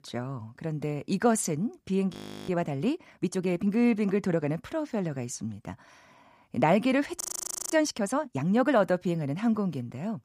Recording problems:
audio freezing; at 2 s and at 7 s for 0.5 s

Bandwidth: 15 kHz